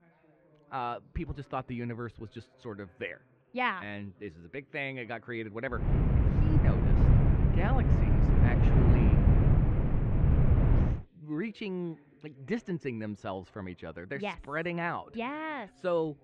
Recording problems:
muffled; very; fading above 2.5 kHz
wind noise on the microphone; heavy; from 6 to 11 s; as loud as the speech
background chatter; faint; throughout; 2 voices, 25 dB below the speech

